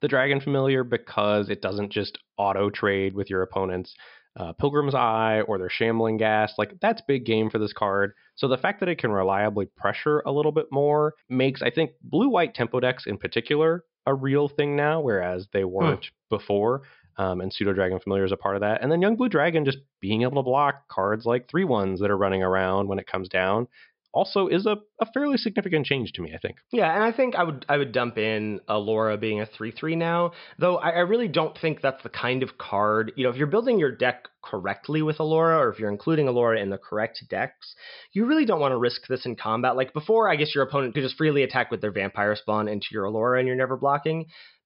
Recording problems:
high frequencies cut off; noticeable; nothing above 5.5 kHz

